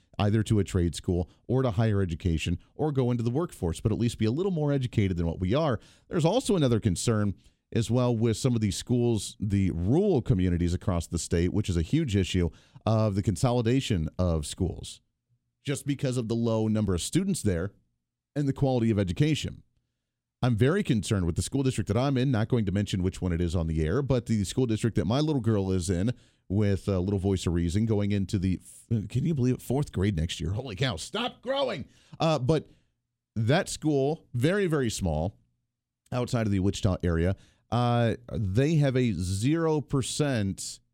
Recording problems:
none

